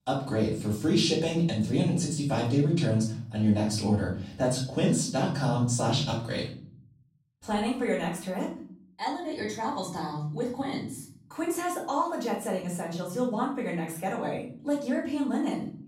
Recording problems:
off-mic speech; far
room echo; noticeable; dies away in 0.8 s

